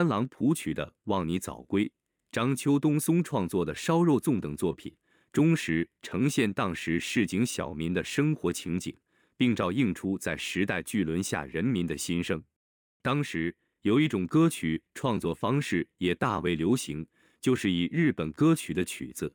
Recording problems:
abrupt cut into speech; at the start

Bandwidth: 18 kHz